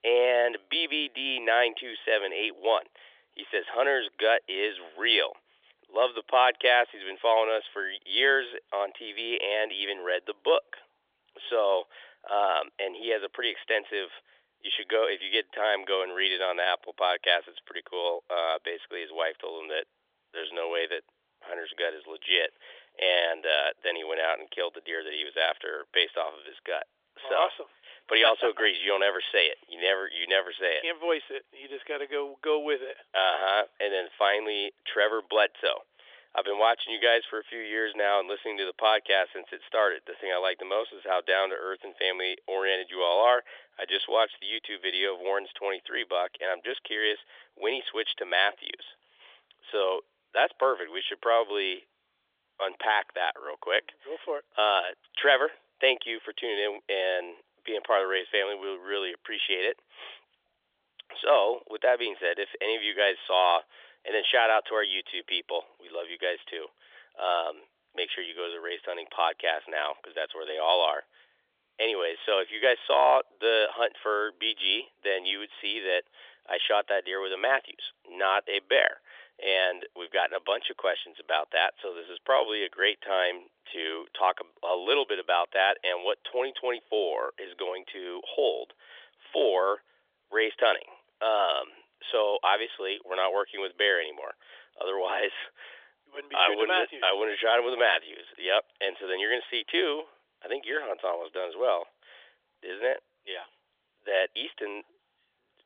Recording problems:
thin; very; fading below 450 Hz
phone-call audio; nothing above 3.5 kHz

